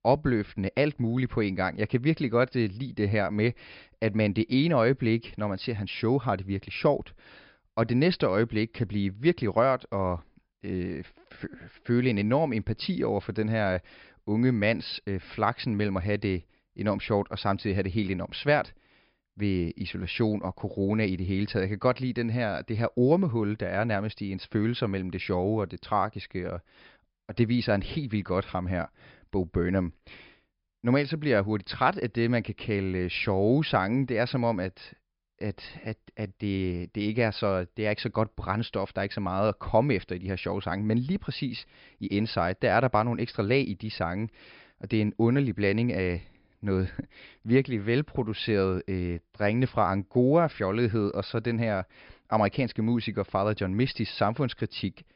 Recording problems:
high frequencies cut off; noticeable; nothing above 5.5 kHz

